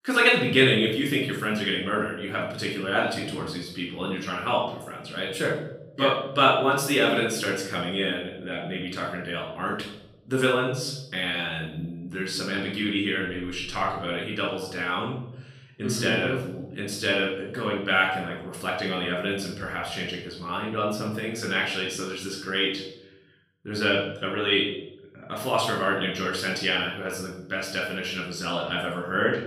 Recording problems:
off-mic speech; far
room echo; noticeable; dies away in 0.8 s

